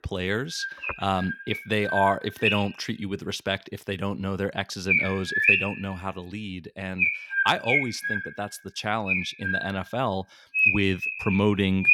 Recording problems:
animal sounds; very loud; throughout; 3 dB above the speech

